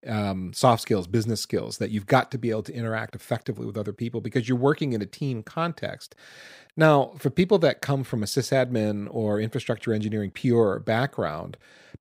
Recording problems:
none

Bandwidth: 15.5 kHz